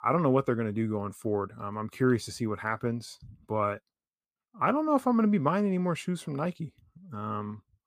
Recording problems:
none

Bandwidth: 15 kHz